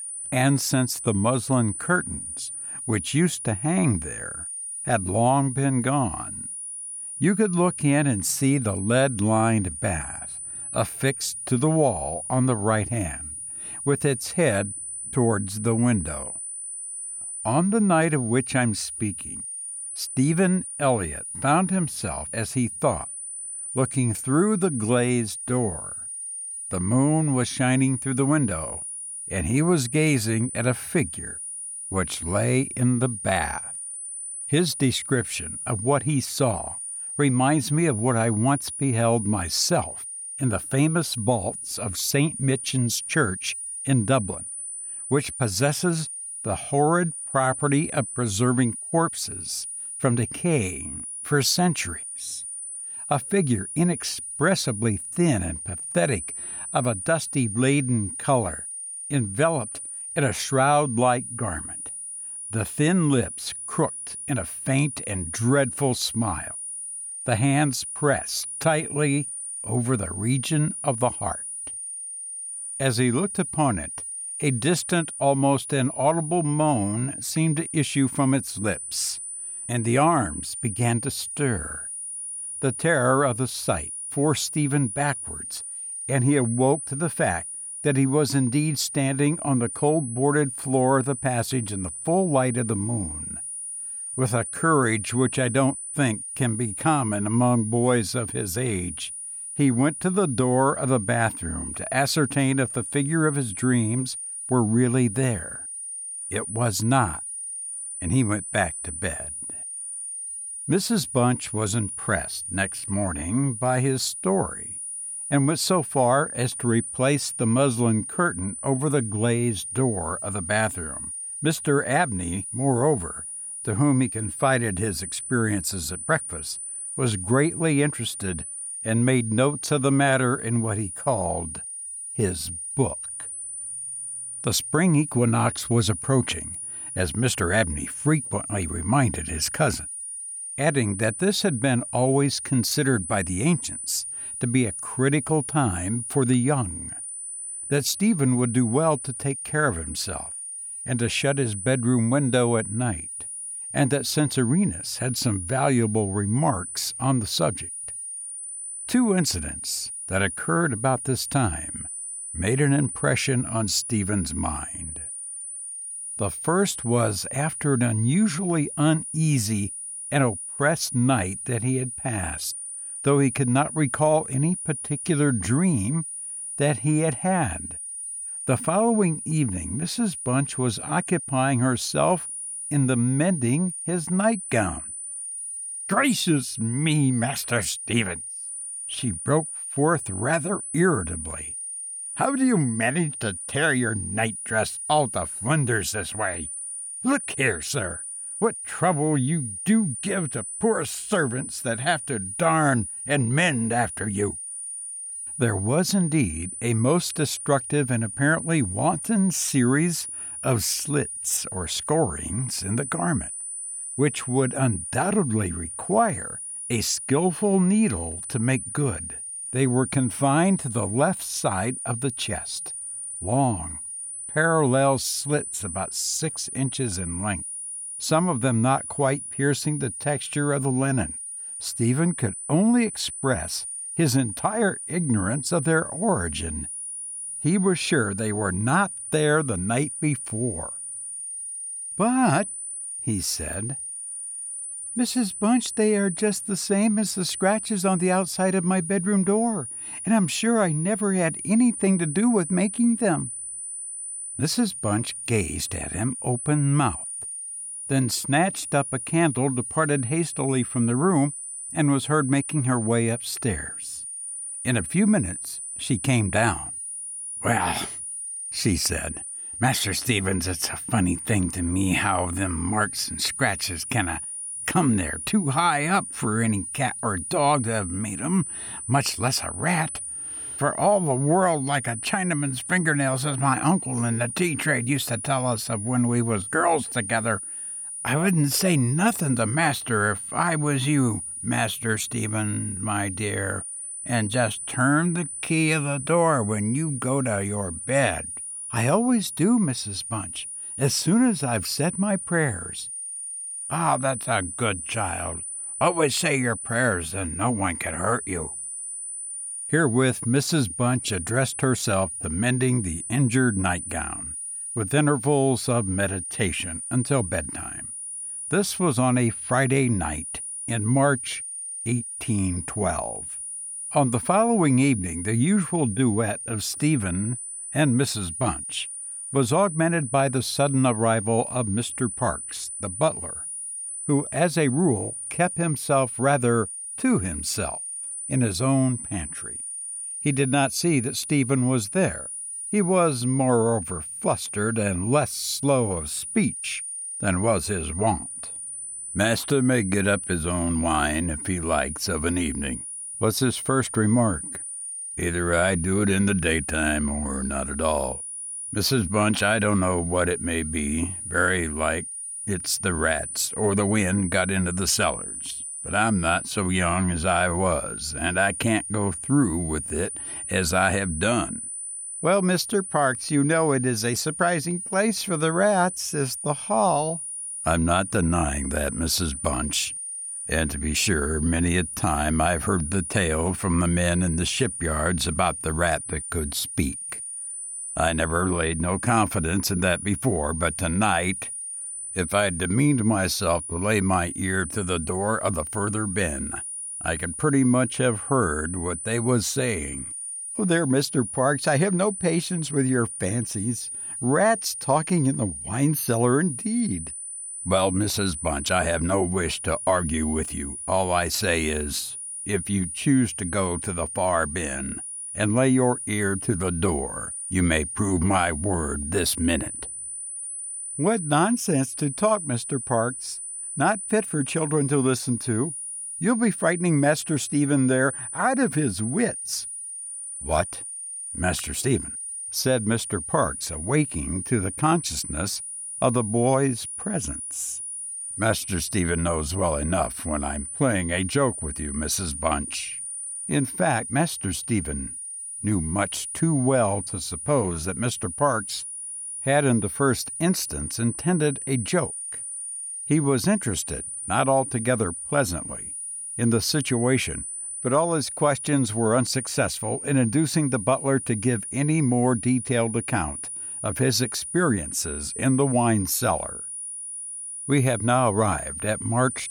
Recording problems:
high-pitched whine; loud; throughout; 9.5 kHz, 7 dB below the speech

